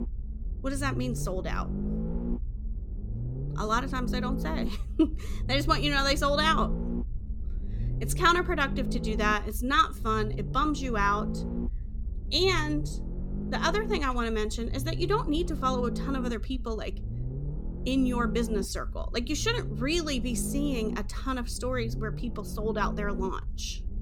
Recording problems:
low rumble; noticeable; throughout; 15 dB below the speech

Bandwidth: 17.5 kHz